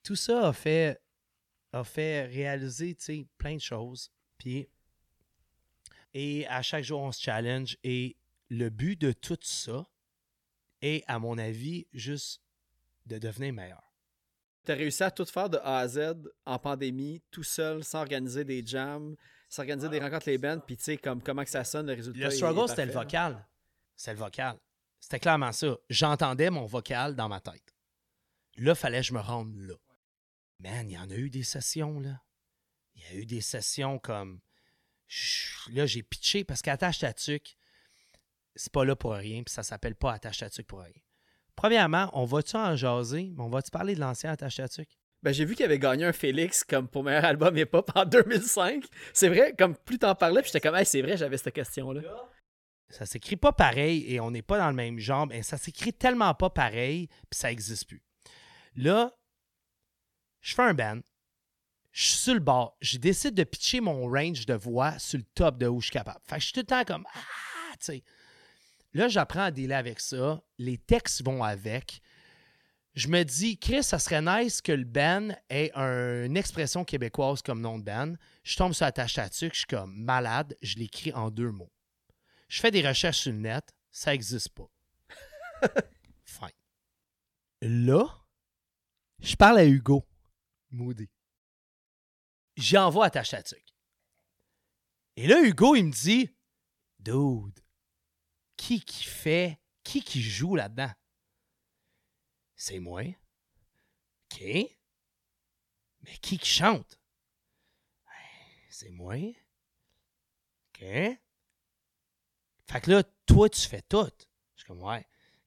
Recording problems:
none

